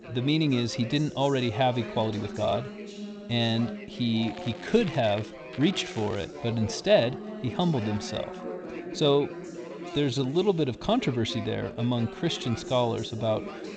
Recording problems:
garbled, watery; slightly; nothing above 7.5 kHz
background chatter; noticeable; throughout; 4 voices, 10 dB below the speech
crackling; faint; from 4 to 5.5 s and at 5.5 s; 20 dB below the speech
uneven, jittery; strongly; from 1 to 13 s

